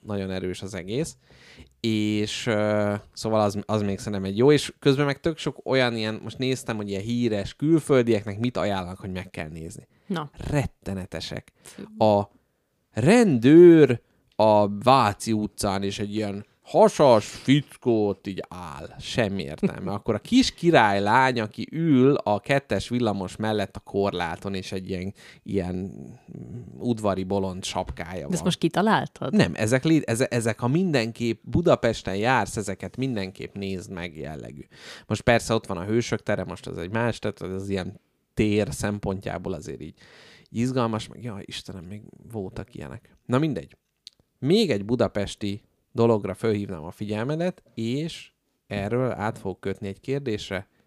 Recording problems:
none

